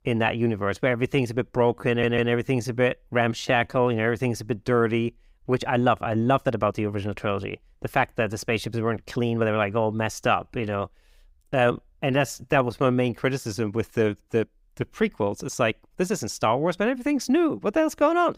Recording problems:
uneven, jittery; strongly; from 1 to 16 s
audio stuttering; at 2 s

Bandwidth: 15.5 kHz